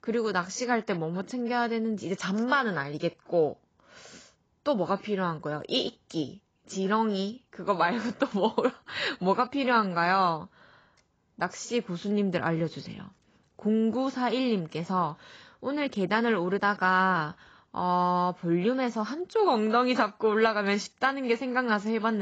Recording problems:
garbled, watery; badly; nothing above 7.5 kHz
abrupt cut into speech; at the end

